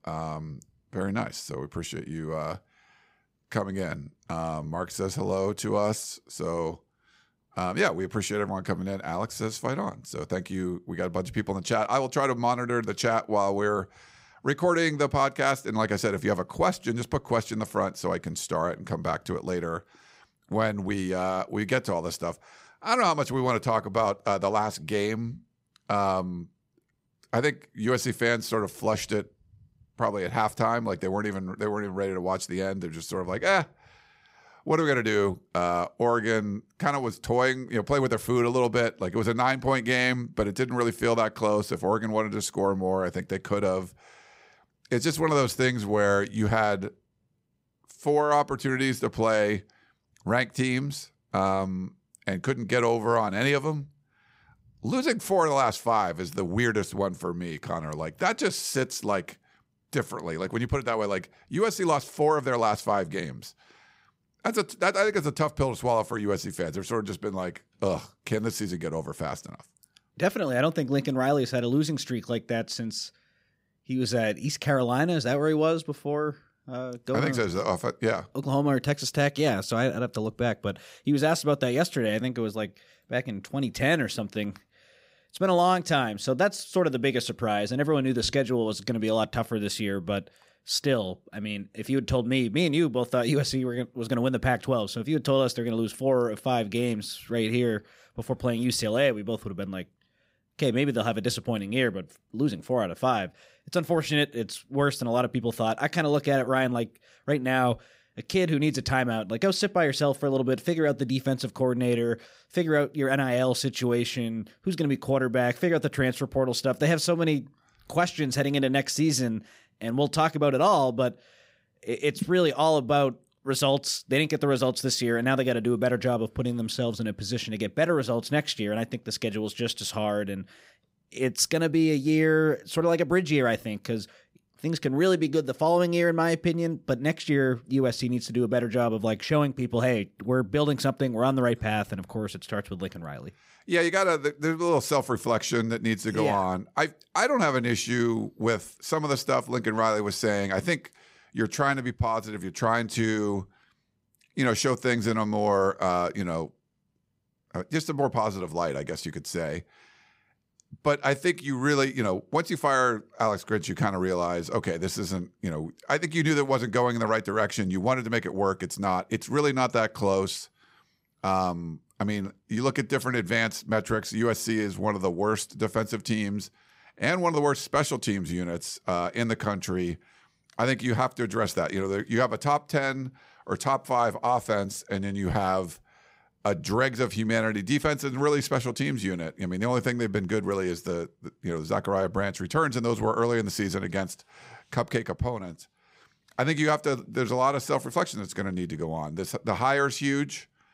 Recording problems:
none

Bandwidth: 15.5 kHz